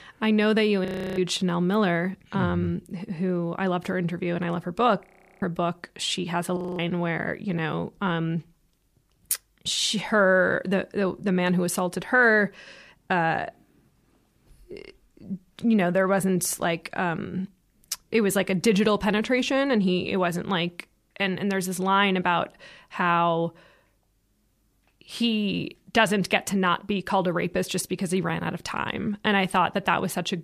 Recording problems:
audio freezing; at 1 s, at 5 s and at 6.5 s

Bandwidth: 15 kHz